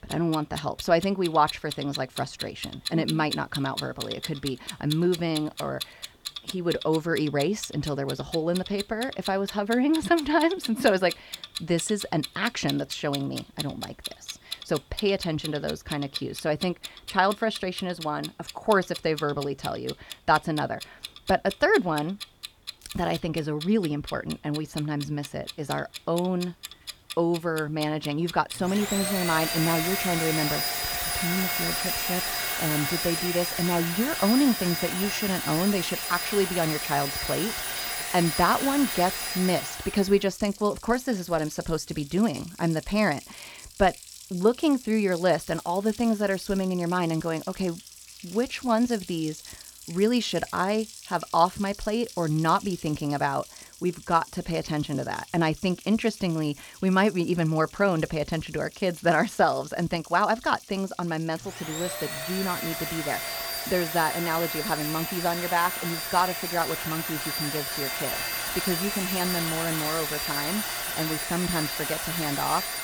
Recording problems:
household noises; loud; throughout; 5 dB below the speech
crackling; very faint; at 23 s, from 45 to 47 s and at 1:05; 25 dB below the speech

